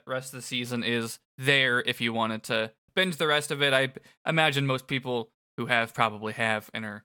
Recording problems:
none

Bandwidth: 17.5 kHz